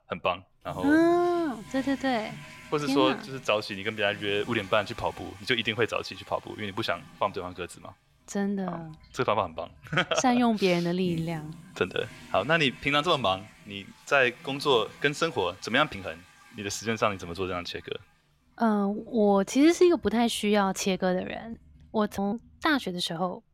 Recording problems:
household noises; faint; throughout; 20 dB below the speech

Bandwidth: 16 kHz